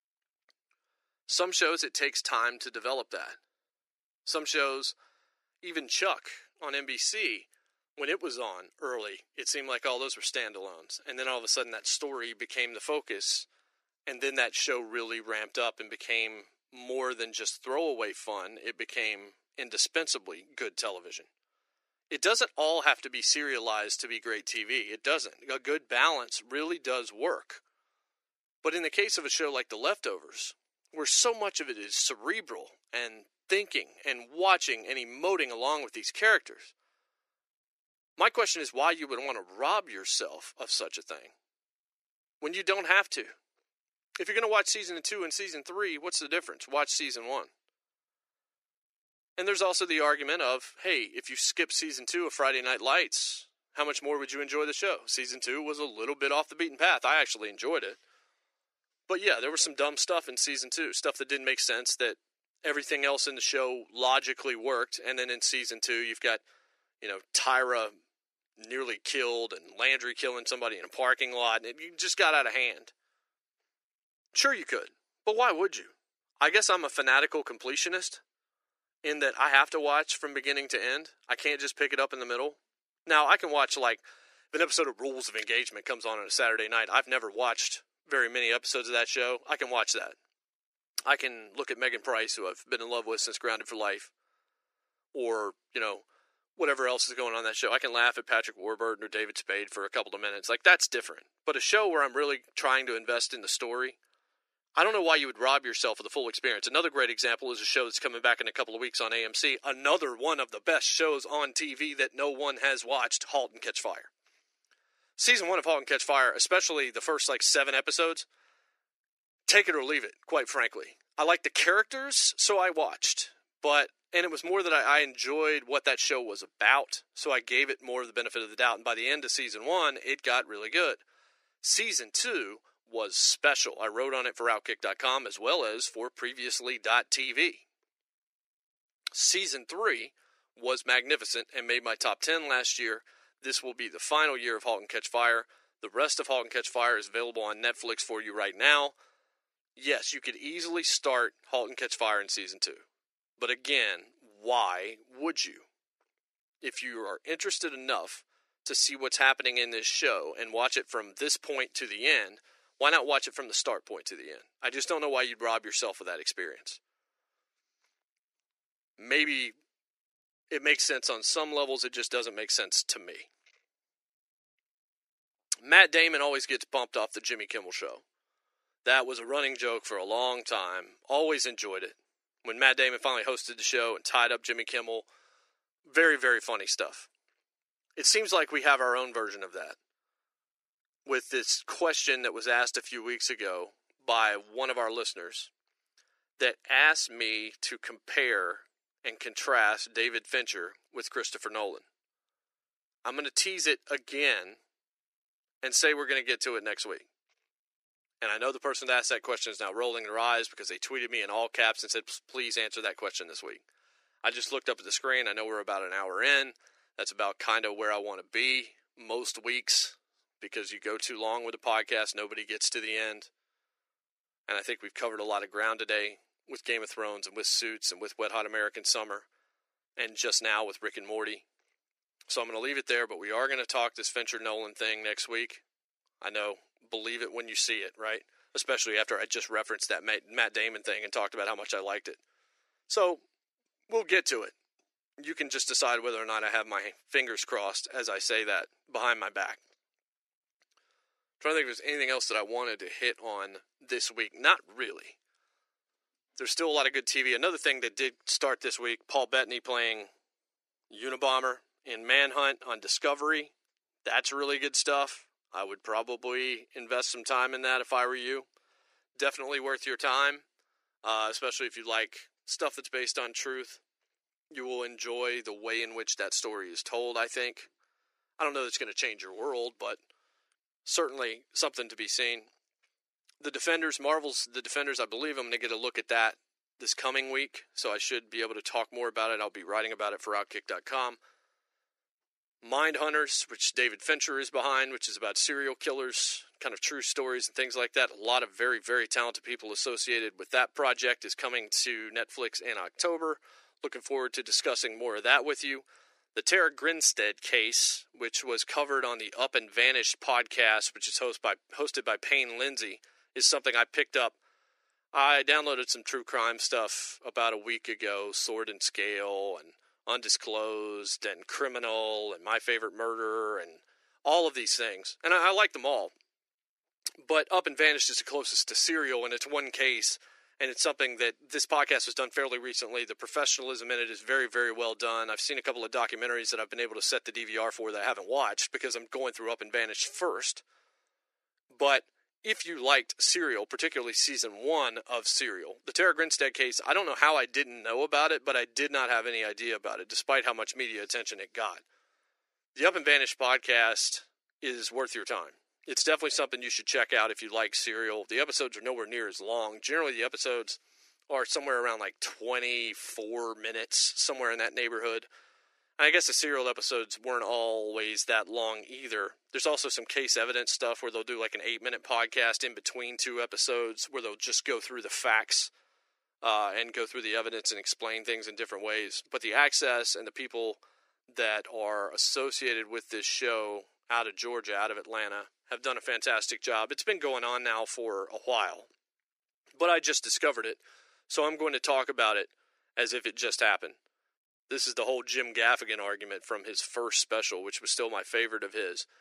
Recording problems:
thin; very; fading below 350 Hz

